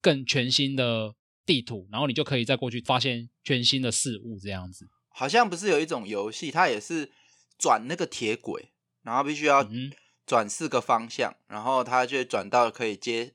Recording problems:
none

